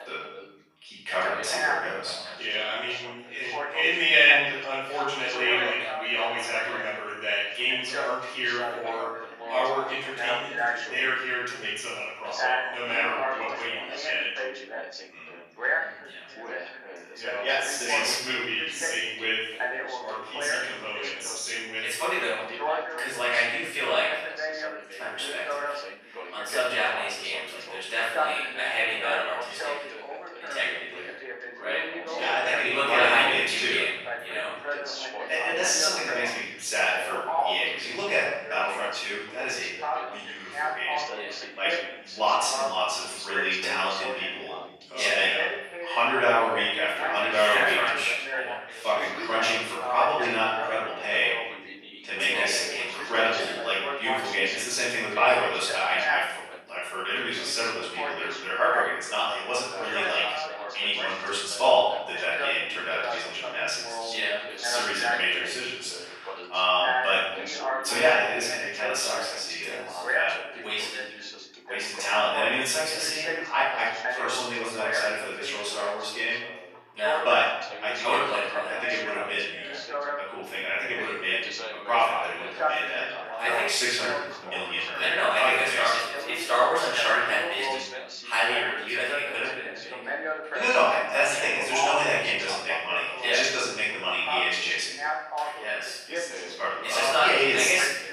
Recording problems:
room echo; strong; dies away in 1 s
off-mic speech; far
thin; very; fading below 750 Hz
background chatter; loud; throughout; 2 voices, 7 dB below the speech

